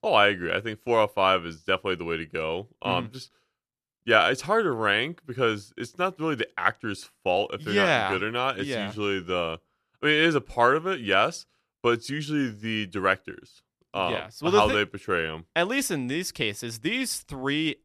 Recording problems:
none

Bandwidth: 13.5 kHz